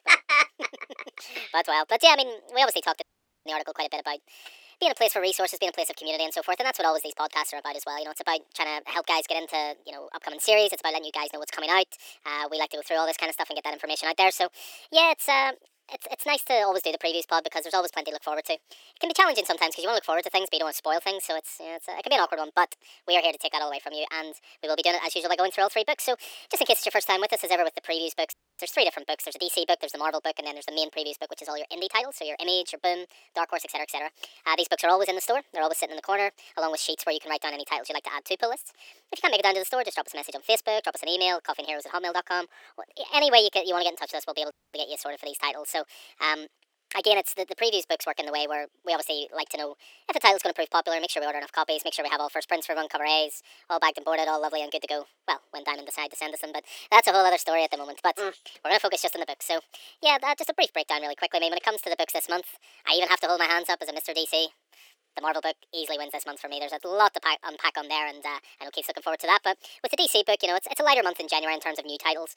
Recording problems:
thin; very; fading below 400 Hz
wrong speed and pitch; too fast and too high; 1.5 times normal speed
audio cutting out; at 3 s, at 28 s and at 45 s

